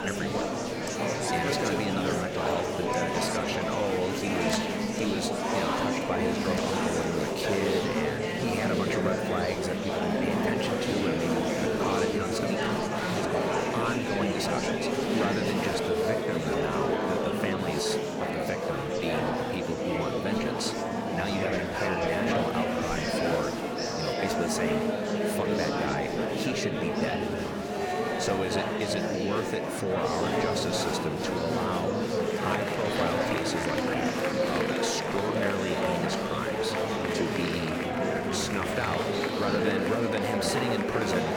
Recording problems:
murmuring crowd; very loud; throughout; 5 dB above the speech

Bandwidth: 18.5 kHz